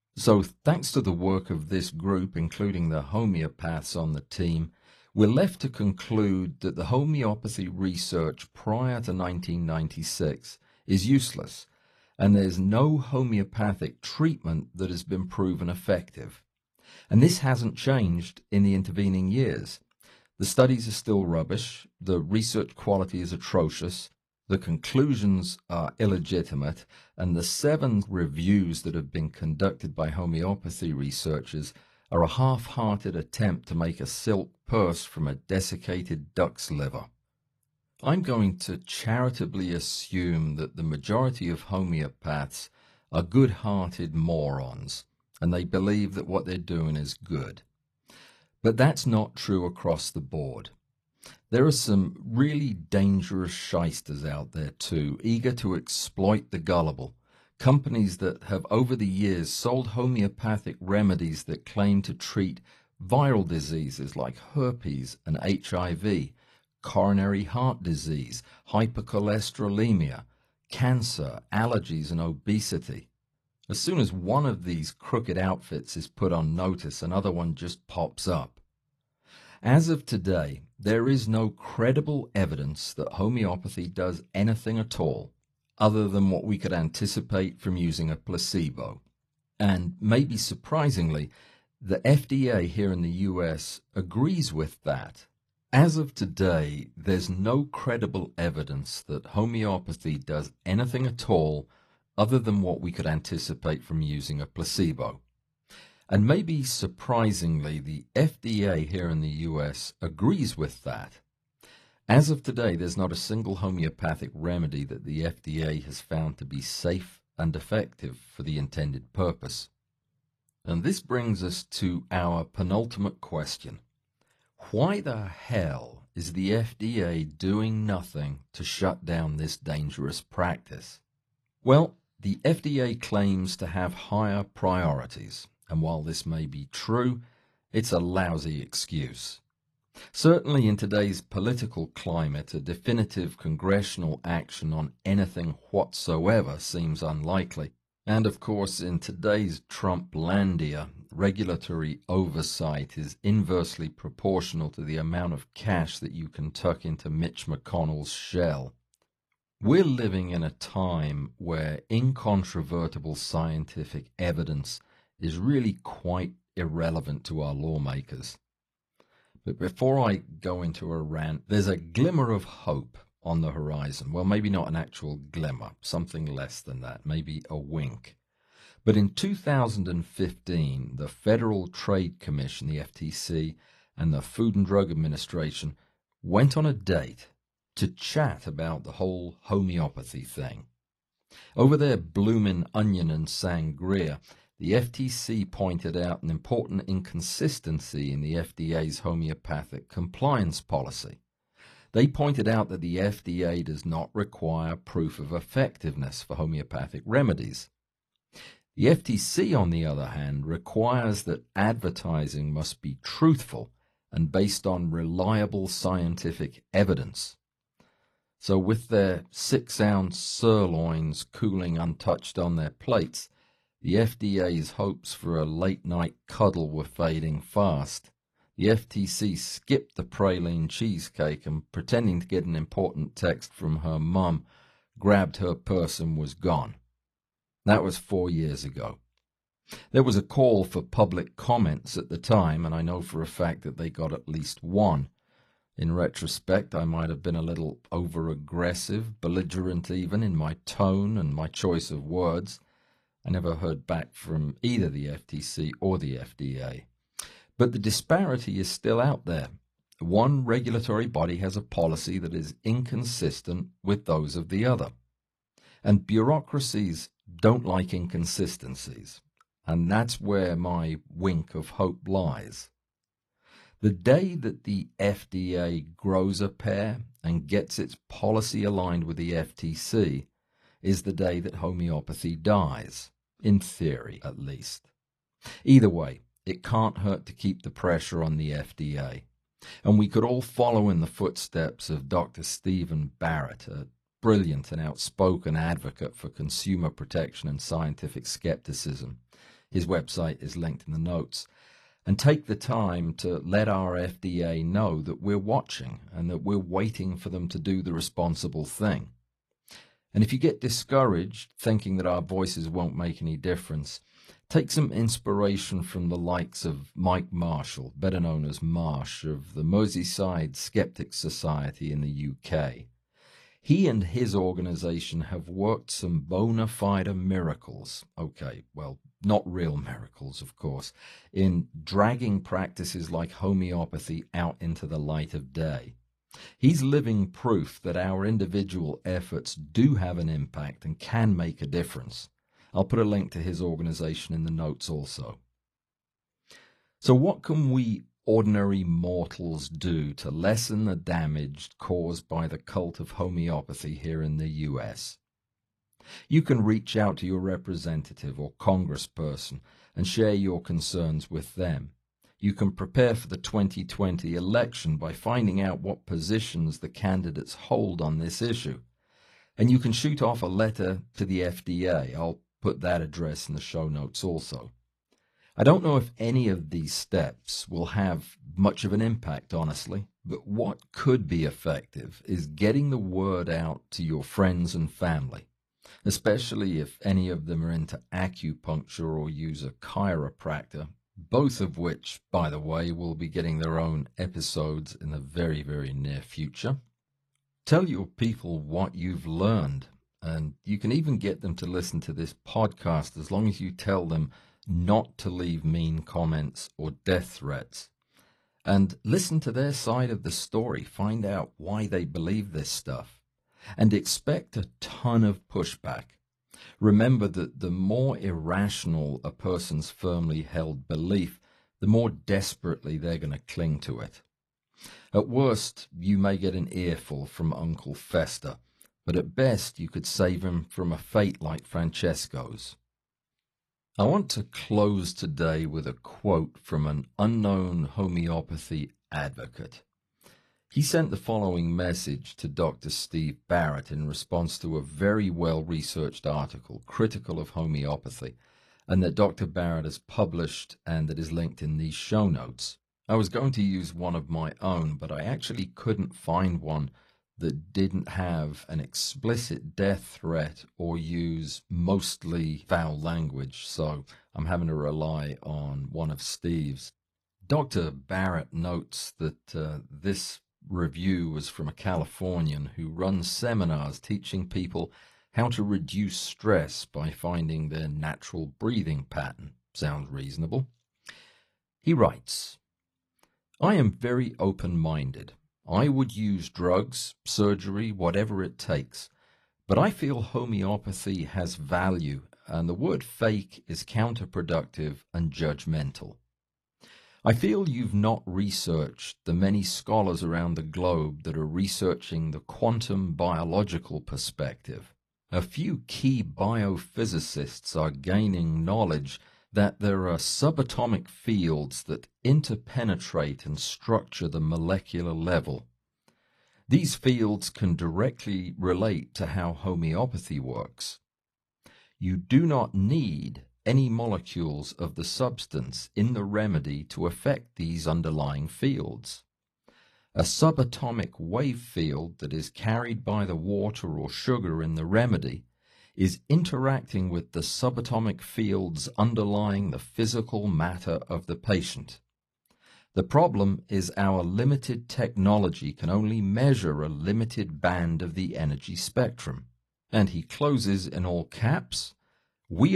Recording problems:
garbled, watery; slightly; nothing above 12 kHz
abrupt cut into speech; at the end

